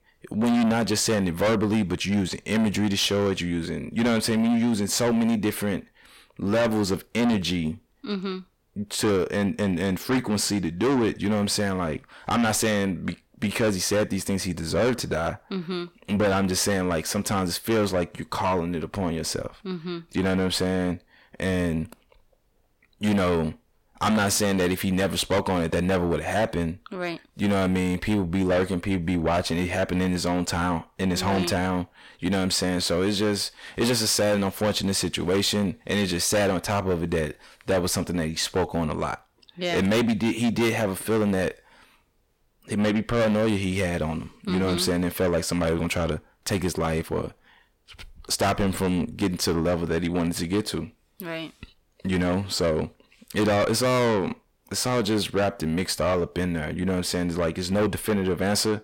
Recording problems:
distortion; heavy; 7 dB below the speech

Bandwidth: 16.5 kHz